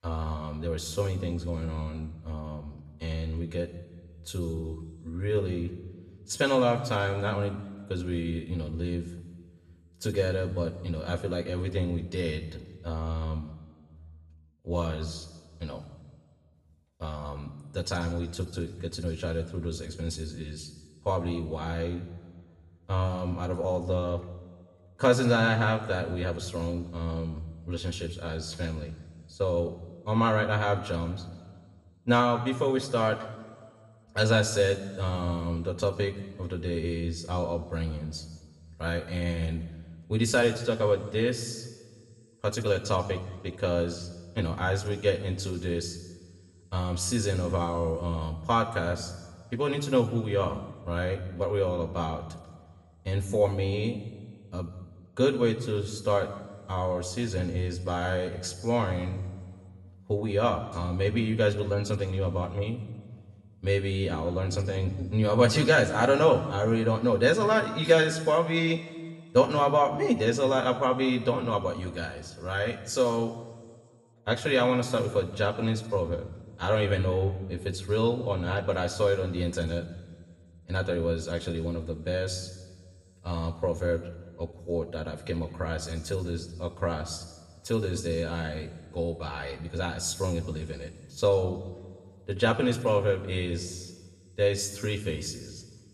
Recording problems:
room echo; slight; dies away in 1.2 s
off-mic speech; somewhat distant

